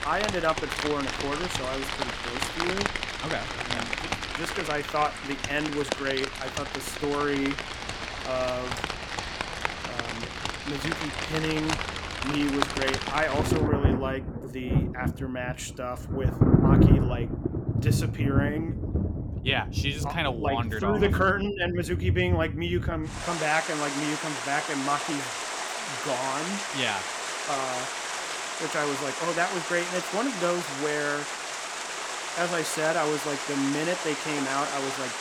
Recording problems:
rain or running water; very loud; throughout; as loud as the speech

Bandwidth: 17.5 kHz